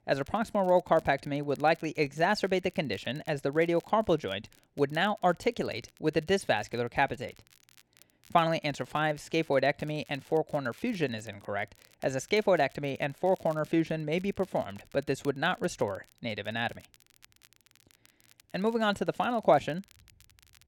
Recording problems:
crackle, like an old record; faint; 30 dB below the speech

